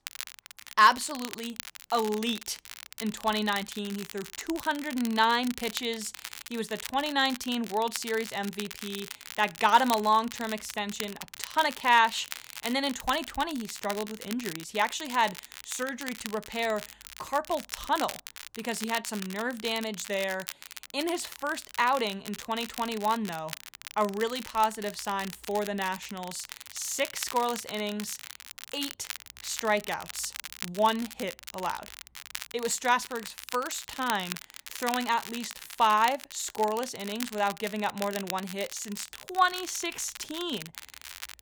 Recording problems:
crackle, like an old record; noticeable; 10 dB below the speech

